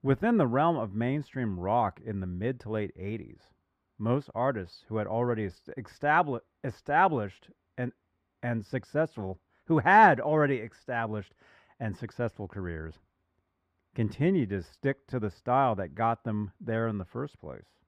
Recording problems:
muffled; very; fading above 3.5 kHz

